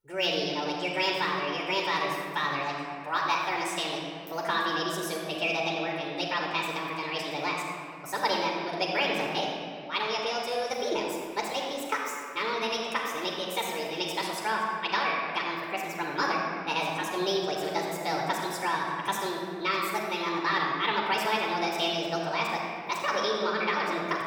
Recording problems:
wrong speed and pitch; too fast and too high; 1.6 times normal speed
room echo; noticeable; dies away in 2 s
off-mic speech; somewhat distant

